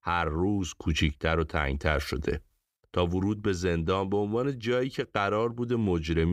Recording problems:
abrupt cut into speech; at the end

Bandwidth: 15.5 kHz